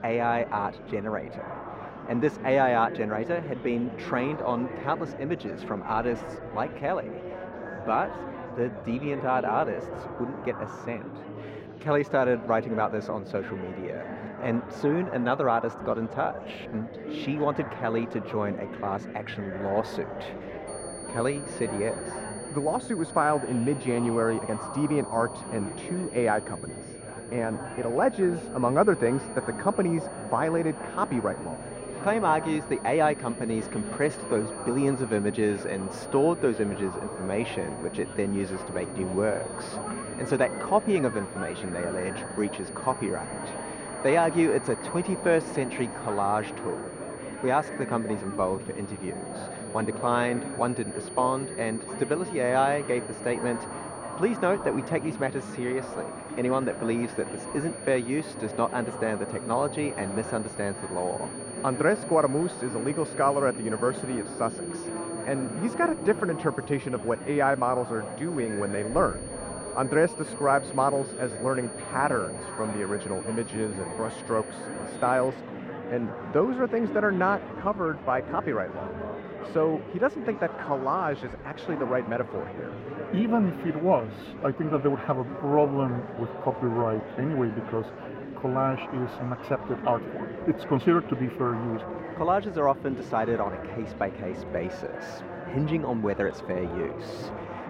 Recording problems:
muffled; very; fading above 3.5 kHz
murmuring crowd; loud; throughout; 9 dB below the speech
high-pitched whine; noticeable; from 21 s to 1:15; 9.5 kHz, 15 dB below the speech

